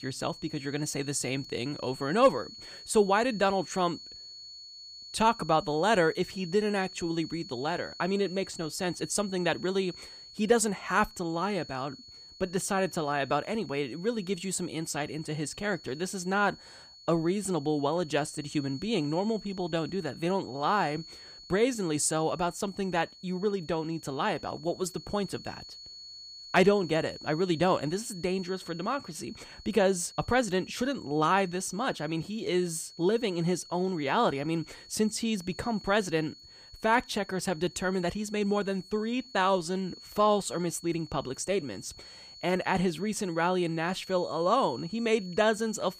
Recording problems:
high-pitched whine; noticeable; throughout; 4.5 kHz, 15 dB below the speech

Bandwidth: 15 kHz